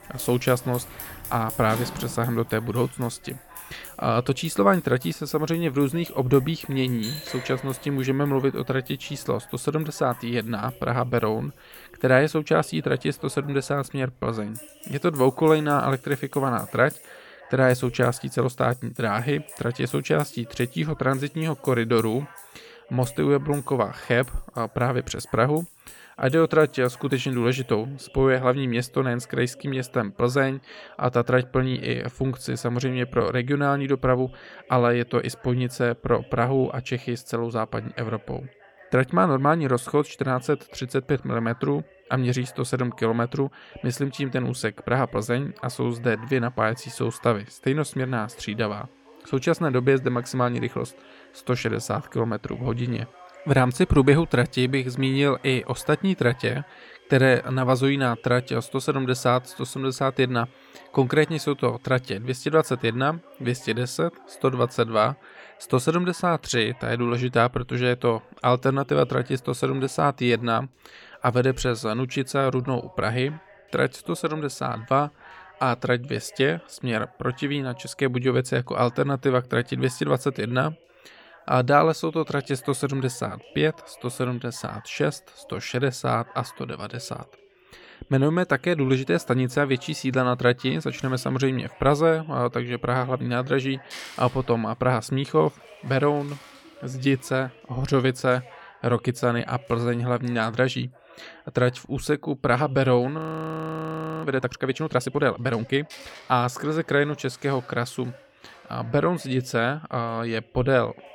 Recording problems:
household noises; noticeable; throughout; 20 dB below the speech
voice in the background; faint; throughout; 25 dB below the speech
audio freezing; at 1:43 for 1 s

